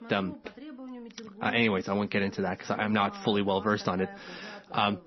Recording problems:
garbled, watery; slightly; nothing above 6 kHz
voice in the background; noticeable; throughout; 15 dB below the speech

